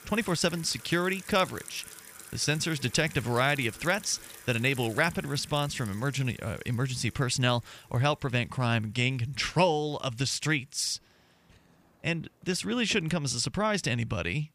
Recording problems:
household noises; noticeable; throughout; 15 dB below the speech

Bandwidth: 15 kHz